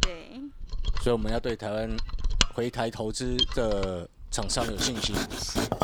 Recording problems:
machinery noise; loud; throughout; 1 dB below the speech

